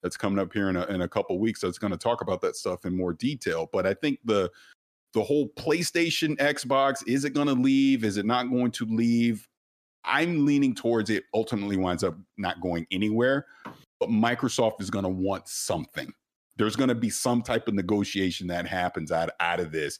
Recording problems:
none

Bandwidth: 14.5 kHz